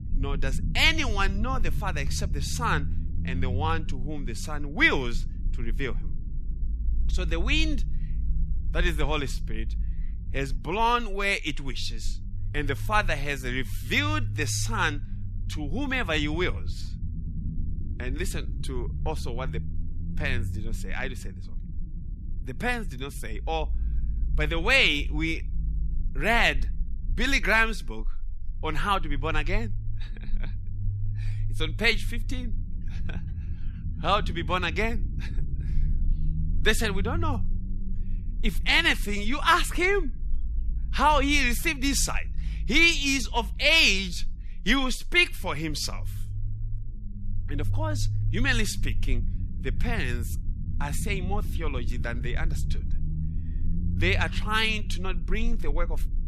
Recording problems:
low rumble; faint; throughout; 25 dB below the speech

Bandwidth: 13.5 kHz